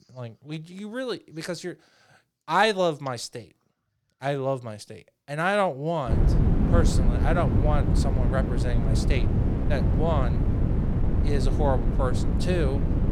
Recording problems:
wind noise on the microphone; heavy; from 6 s on; 6 dB below the speech

